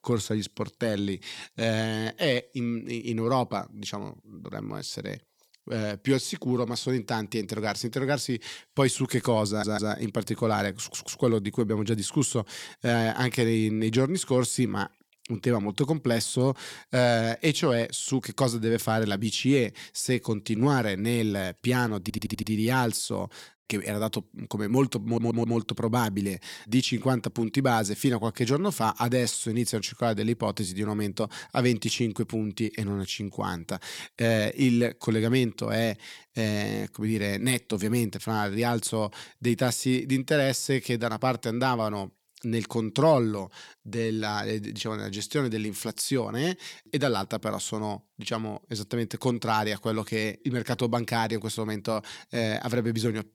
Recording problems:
audio stuttering; 4 times, first at 9.5 s

